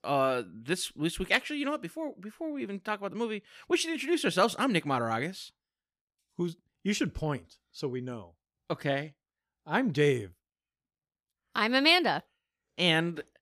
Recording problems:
none

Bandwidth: 15.5 kHz